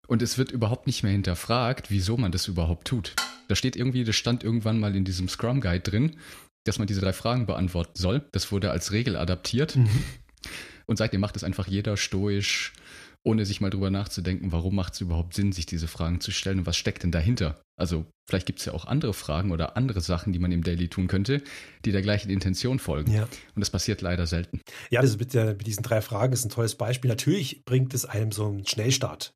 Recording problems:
uneven, jittery; strongly; from 1 to 28 s
clattering dishes; noticeable; at 3 s; peak 3 dB below the speech

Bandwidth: 14.5 kHz